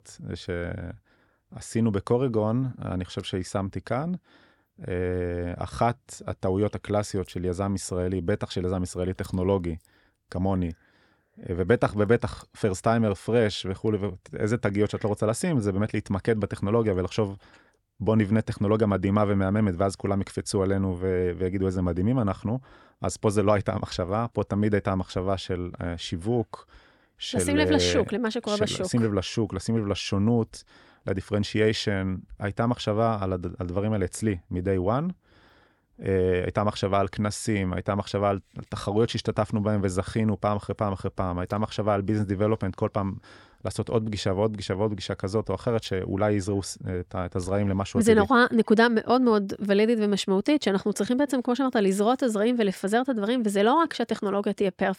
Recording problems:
none

